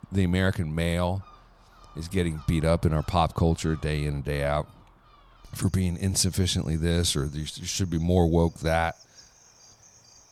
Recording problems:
animal sounds; faint; throughout; 25 dB below the speech

